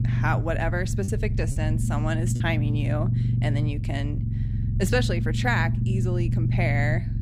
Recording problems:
low rumble; loud; throughout; 8 dB below the speech
choppy; occasionally; at 1 s and at 2.5 s; 4% of the speech affected

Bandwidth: 15.5 kHz